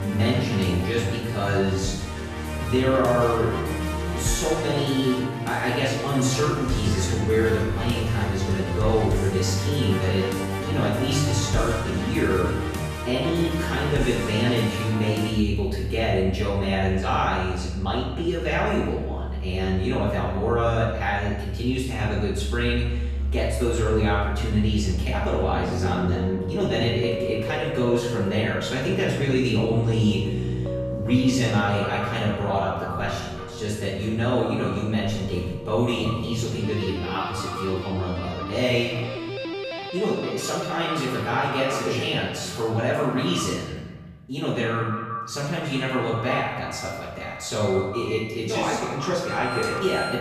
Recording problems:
off-mic speech; far
echo of what is said; noticeable; from 30 s on; 190 ms later, 10 dB below the speech
room echo; noticeable; dies away in 1 s
background music; loud; throughout; 5 dB below the speech

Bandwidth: 14.5 kHz